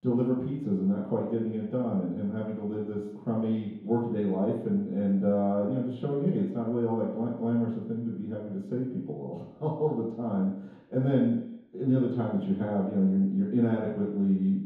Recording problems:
off-mic speech; far
room echo; noticeable; dies away in 0.9 s

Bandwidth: 15 kHz